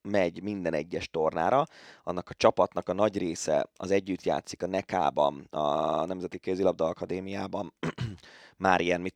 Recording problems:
audio stuttering; at 5.5 s

